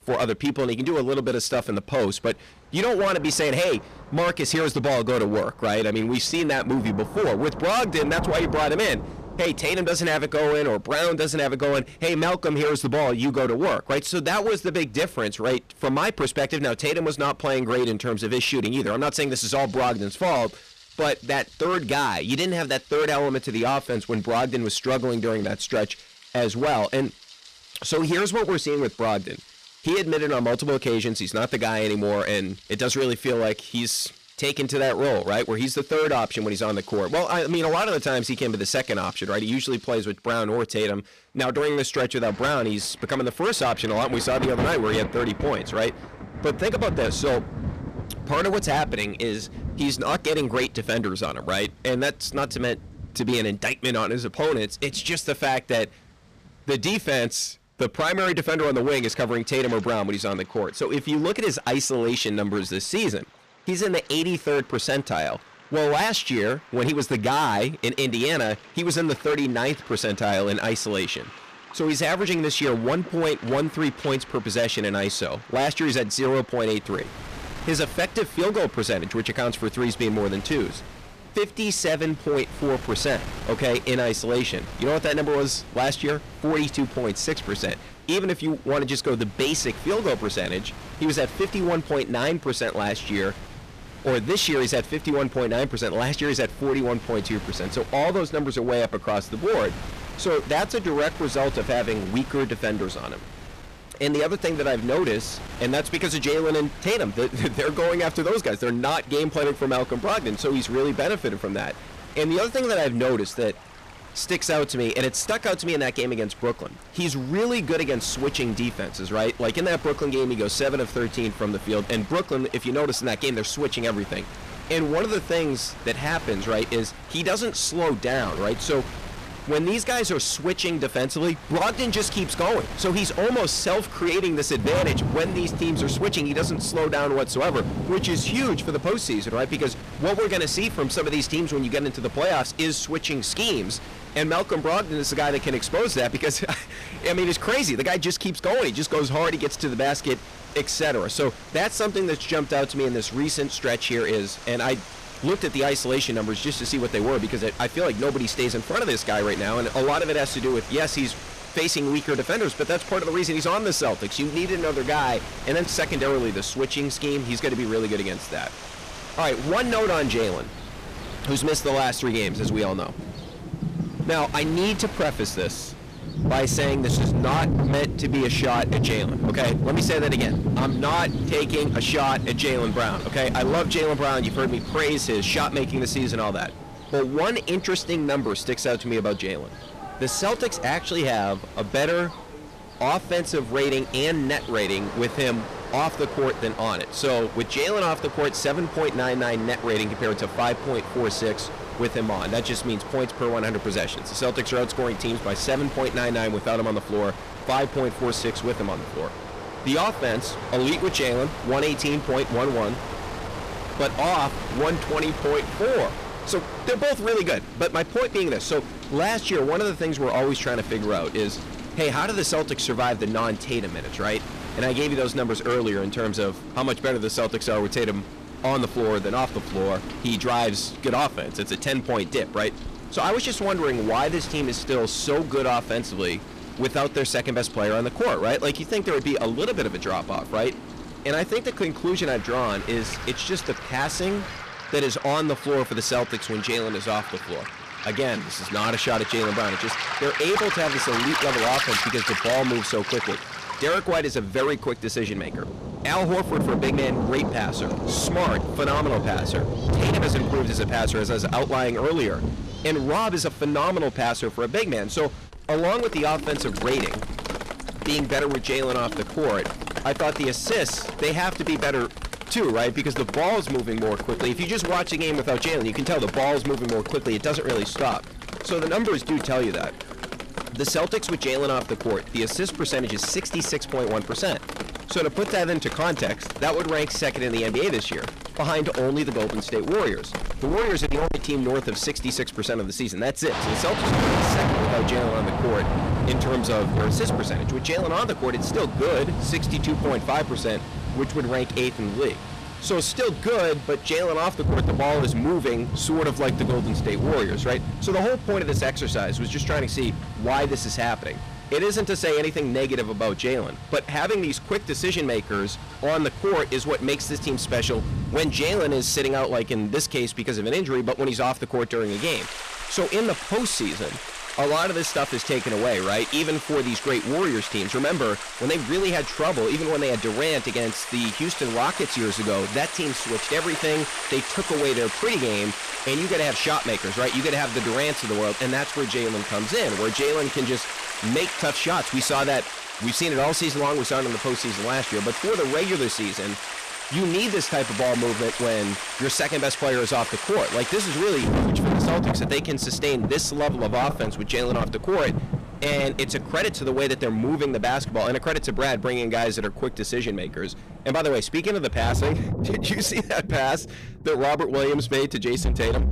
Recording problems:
distortion; heavy; 15% of the sound clipped
rain or running water; loud; throughout; 7 dB below the speech
wind noise on the microphone; occasional gusts; from 1:17 to 4:04; 15 dB below the speech

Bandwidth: 14.5 kHz